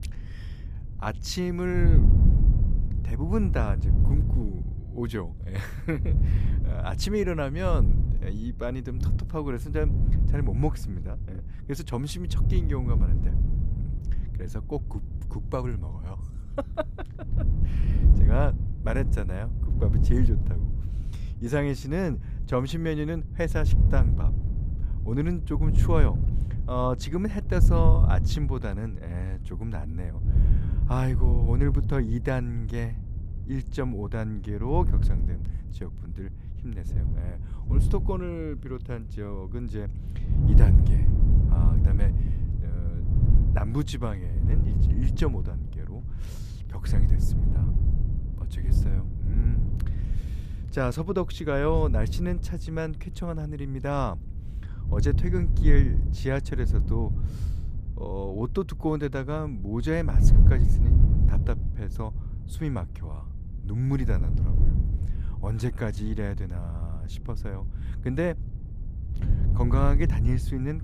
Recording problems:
wind noise on the microphone; heavy; 8 dB below the speech

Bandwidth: 14.5 kHz